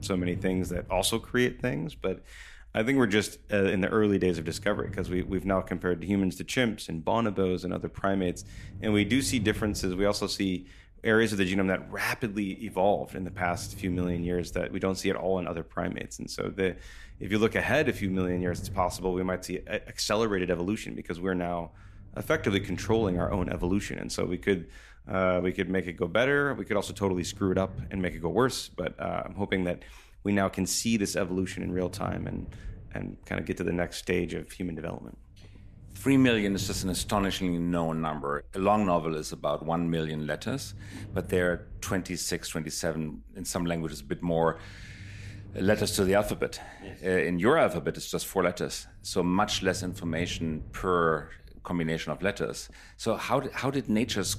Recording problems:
low rumble; faint; throughout; 25 dB below the speech

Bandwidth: 14.5 kHz